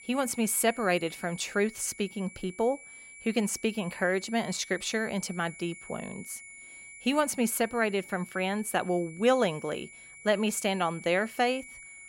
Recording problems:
high-pitched whine; noticeable; throughout; 2.5 kHz, 15 dB below the speech

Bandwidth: 16 kHz